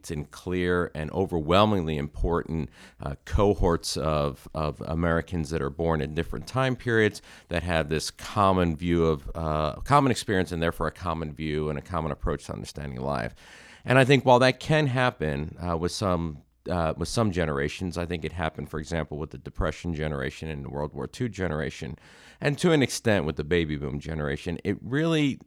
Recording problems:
none

